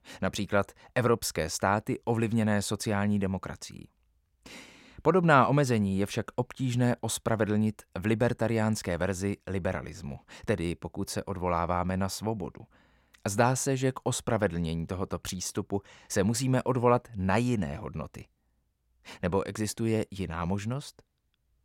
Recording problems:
none

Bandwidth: 16 kHz